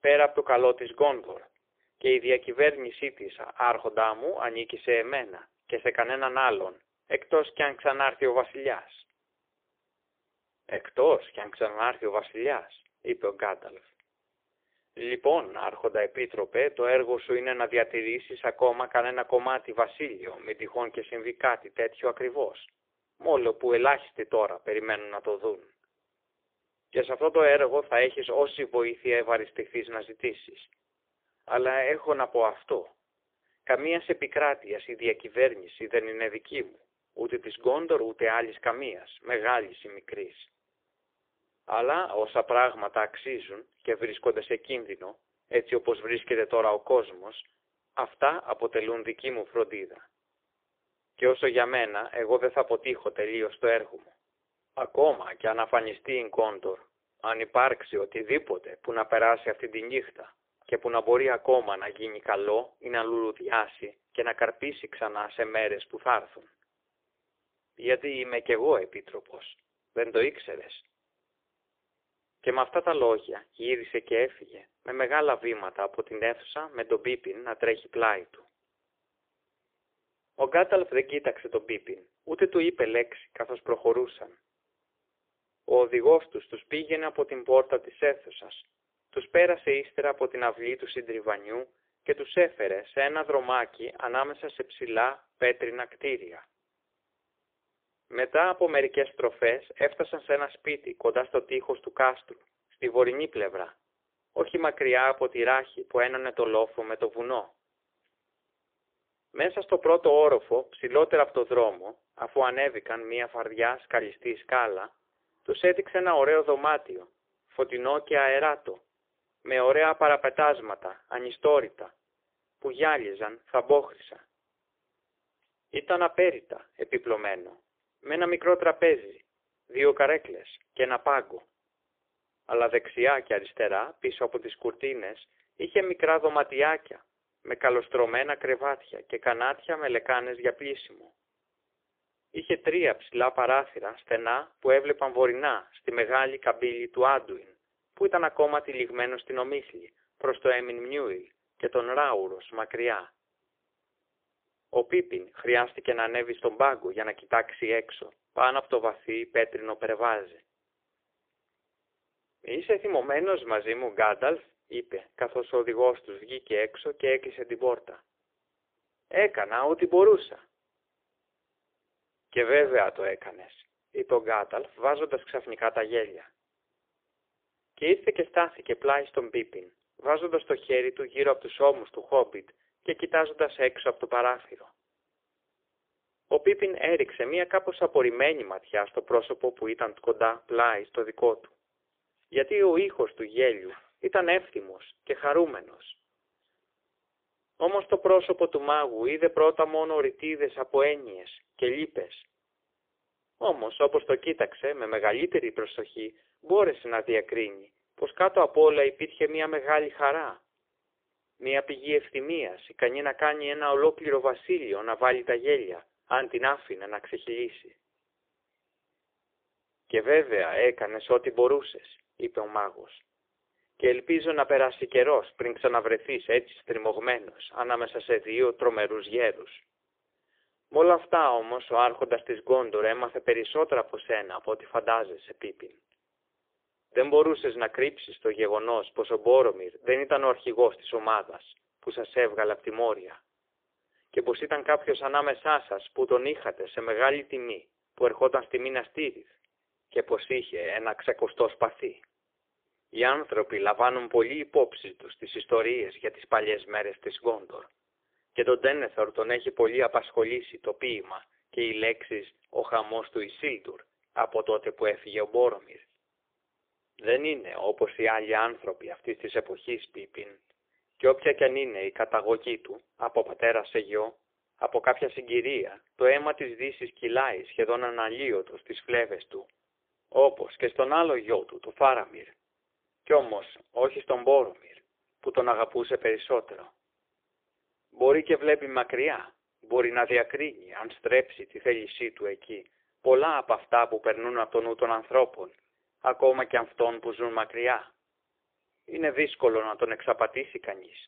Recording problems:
phone-call audio; poor line; nothing above 3.5 kHz

